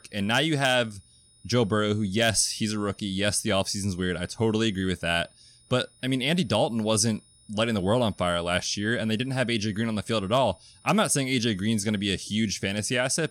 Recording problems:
high-pitched whine; faint; throughout; 9.5 kHz, 30 dB below the speech

